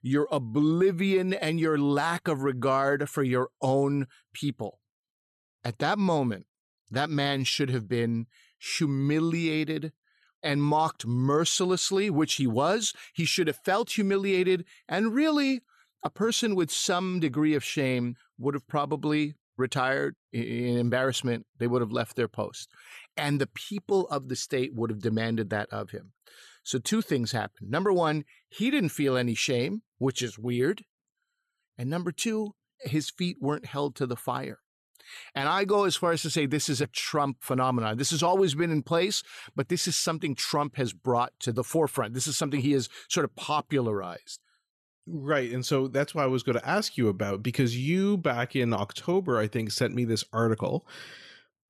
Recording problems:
none

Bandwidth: 13.5 kHz